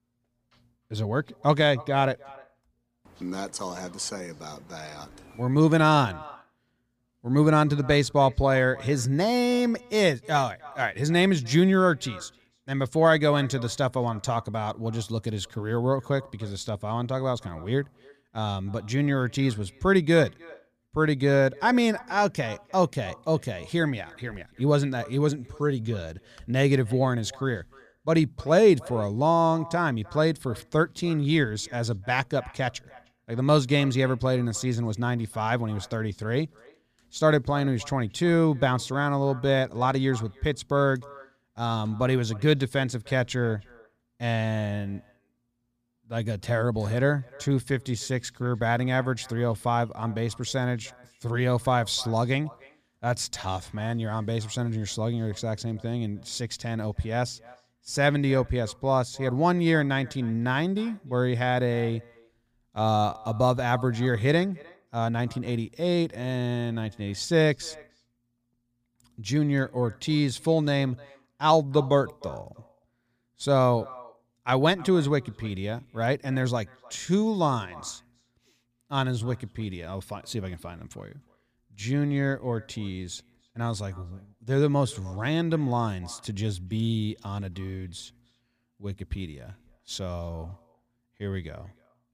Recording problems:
echo of what is said; faint; throughout; 300 ms later, 25 dB below the speech

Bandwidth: 15 kHz